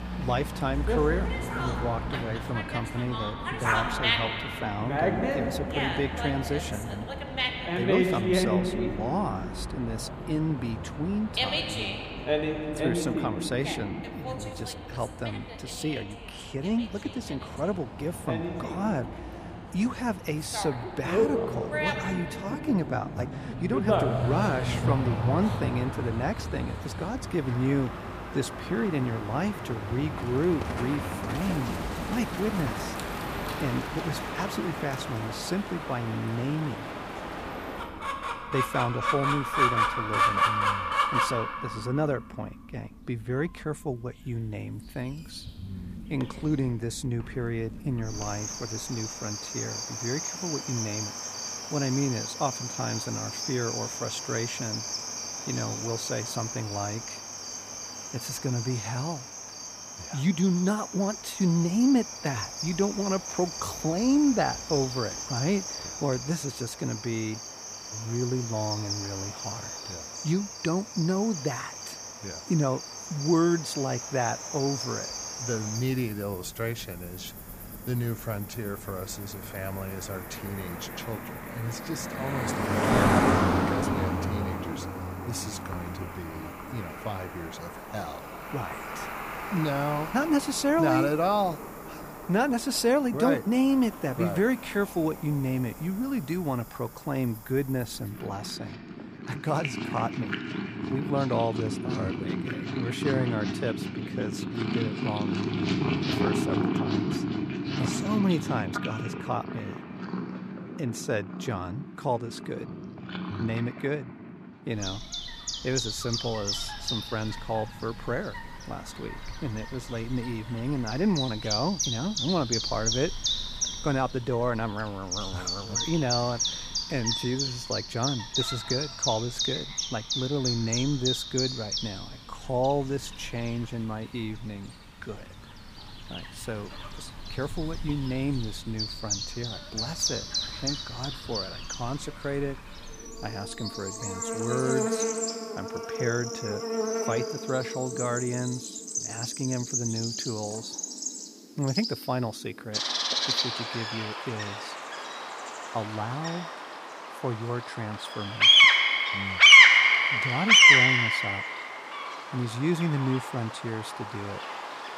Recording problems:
animal sounds; very loud; throughout; 3 dB above the speech

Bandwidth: 15 kHz